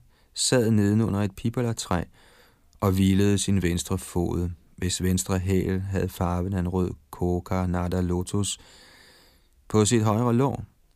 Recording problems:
none

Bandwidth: 15 kHz